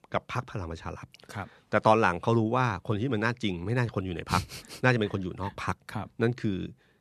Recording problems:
none

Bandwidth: 13.5 kHz